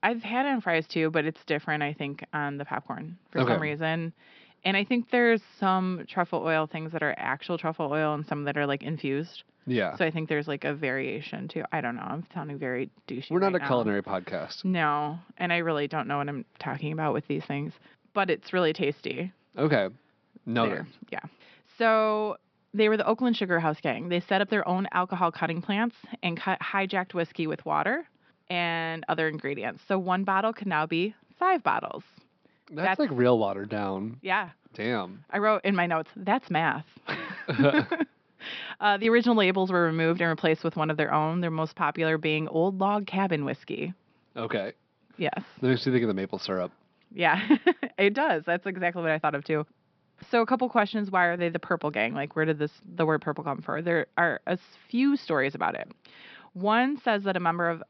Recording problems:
high frequencies cut off; noticeable; nothing above 5.5 kHz

